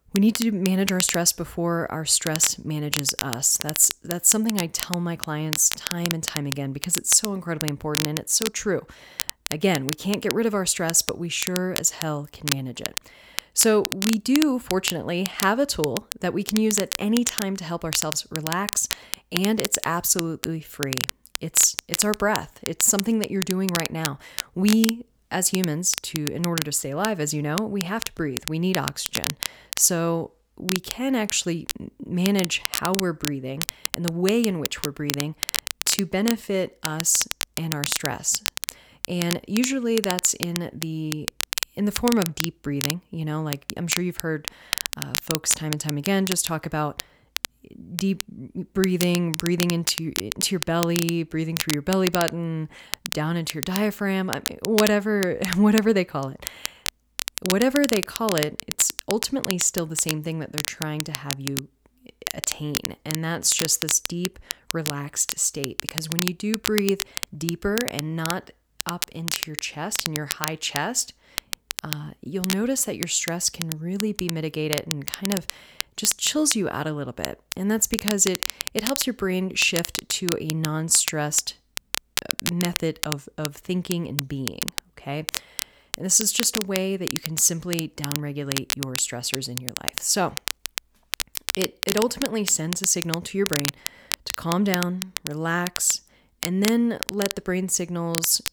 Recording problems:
crackle, like an old record; loud; 6 dB below the speech

